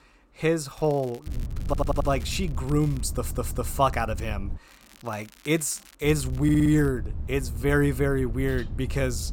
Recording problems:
low rumble; faint; from 1.5 to 4.5 s and from 6 s on; 20 dB below the speech
crackling; faint; from 1 to 3 s and from 4.5 to 7 s; 25 dB below the speech
audio stuttering; at 1.5 s, at 3 s and at 6.5 s

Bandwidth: 16.5 kHz